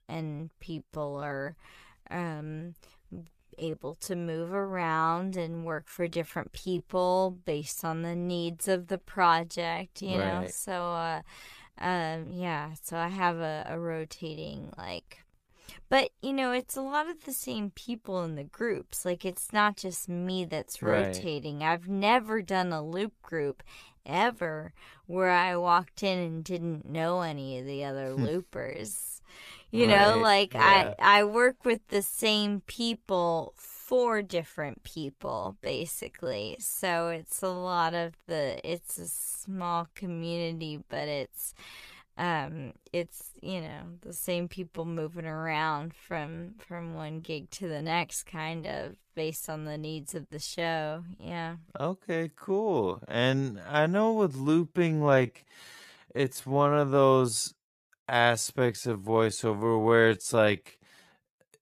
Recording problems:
wrong speed, natural pitch; too slow; 0.6 times normal speed

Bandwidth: 14.5 kHz